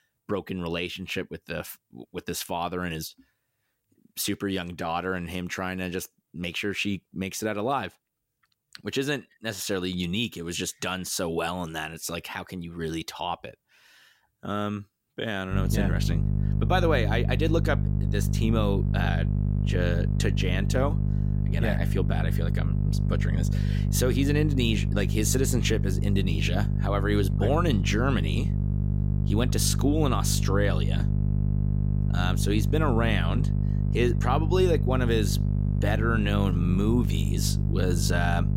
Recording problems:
electrical hum; loud; from 16 s on; 50 Hz, 8 dB below the speech

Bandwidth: 16 kHz